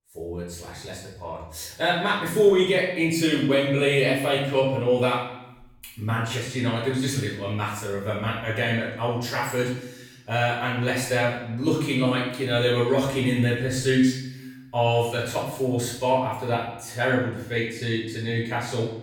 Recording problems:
off-mic speech; far
room echo; noticeable; dies away in 0.7 s

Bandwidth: 18 kHz